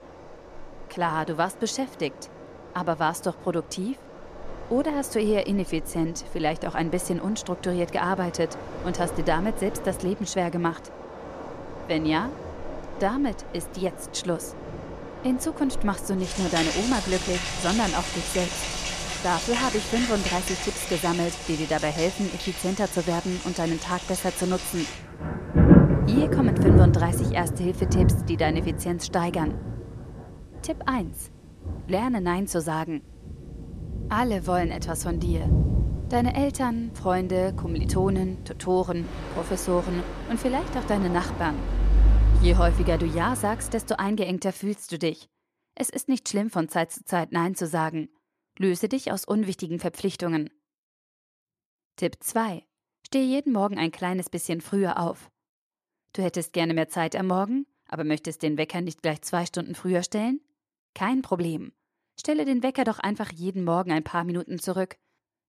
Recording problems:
rain or running water; loud; until 44 s; as loud as the speech

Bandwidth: 14.5 kHz